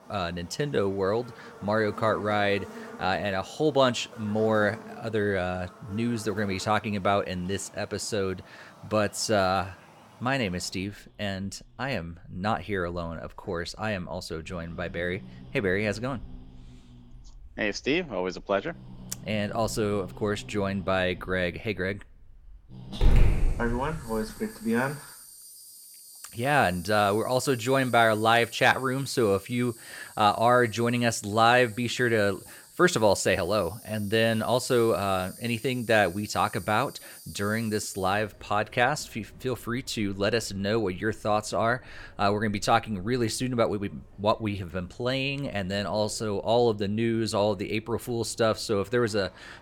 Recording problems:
animal sounds; noticeable; throughout; 15 dB below the speech

